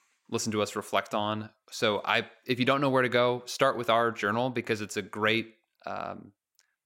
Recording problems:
none

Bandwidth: 16 kHz